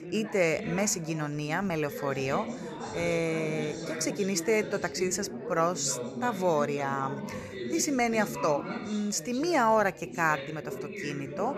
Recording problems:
background chatter; loud; throughout; 3 voices, 9 dB below the speech

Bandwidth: 13.5 kHz